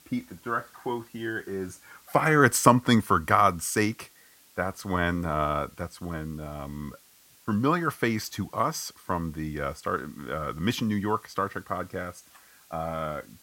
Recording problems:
hiss; faint; throughout; 25 dB below the speech

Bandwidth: 16.5 kHz